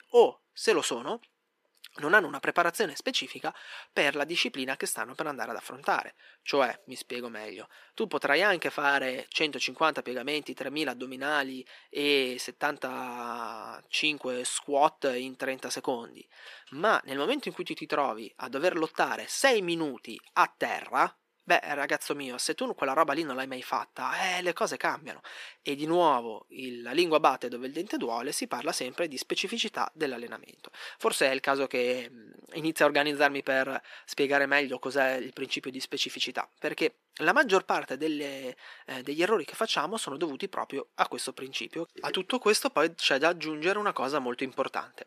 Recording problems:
thin; somewhat; fading below 350 Hz

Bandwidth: 14.5 kHz